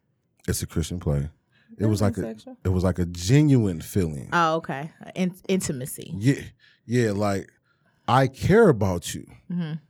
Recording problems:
none

